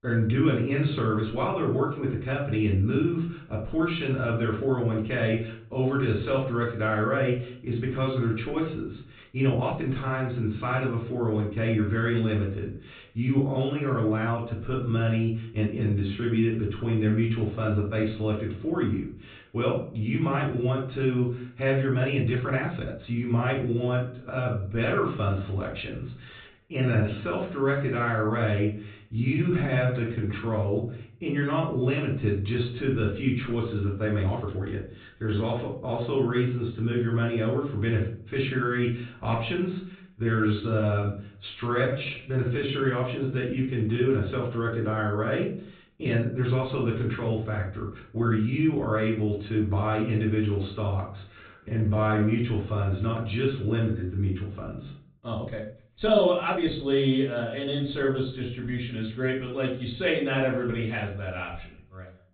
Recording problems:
off-mic speech; far
high frequencies cut off; severe; nothing above 4 kHz
room echo; slight; dies away in 0.4 s
uneven, jittery; strongly; from 9 to 57 s

